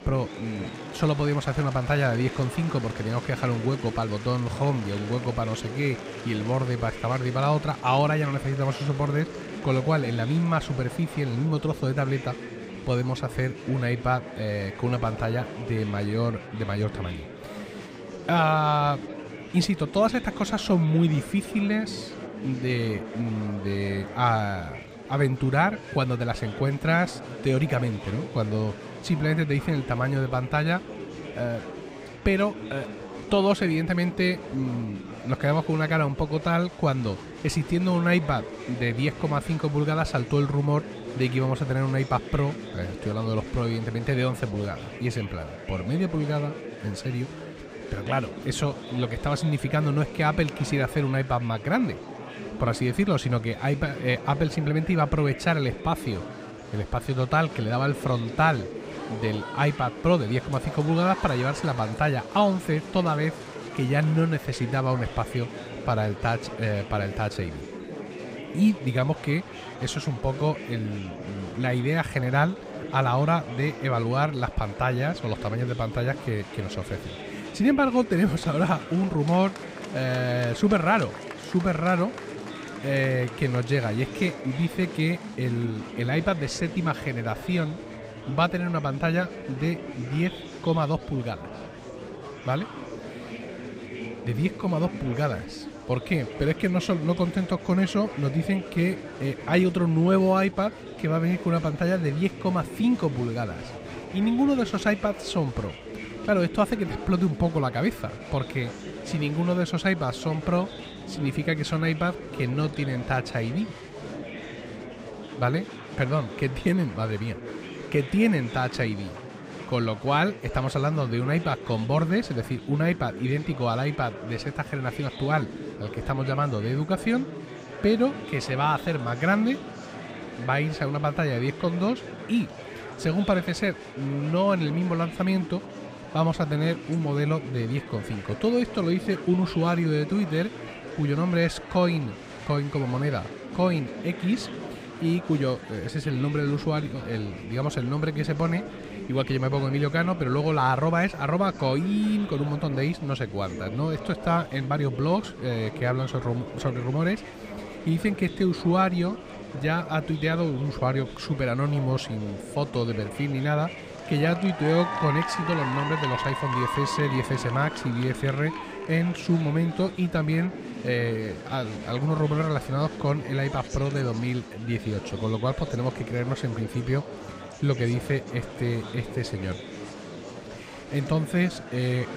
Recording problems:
murmuring crowd; noticeable; throughout; 10 dB below the speech

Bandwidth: 15.5 kHz